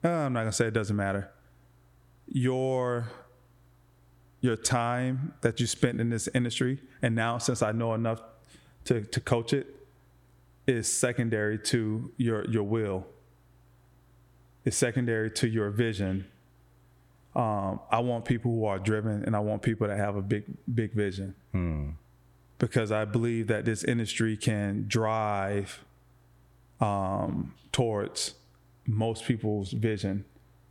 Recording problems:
squashed, flat; heavily

